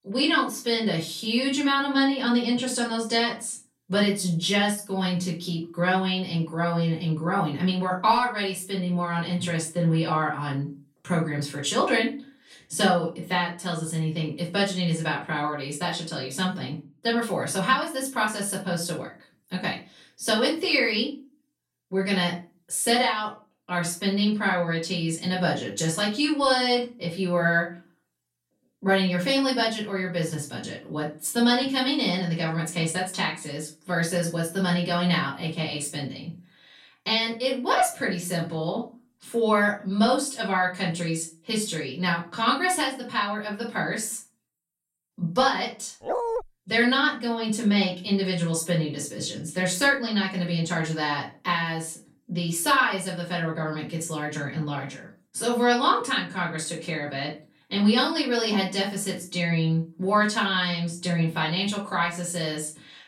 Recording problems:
off-mic speech; far
room echo; slight; dies away in 0.3 s
dog barking; noticeable; at 46 s; peak 2 dB below the speech

